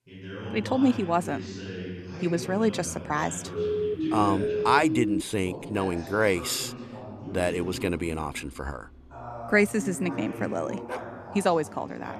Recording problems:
voice in the background; noticeable; throughout; 10 dB below the speech
siren; noticeable; from 3.5 to 5 s; peak level with the speech
dog barking; faint; at 11 s; peak 10 dB below the speech

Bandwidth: 13.5 kHz